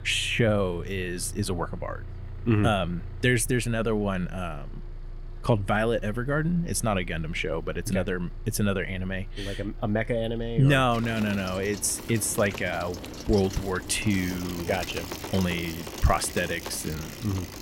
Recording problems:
traffic noise; noticeable; throughout; 10 dB below the speech

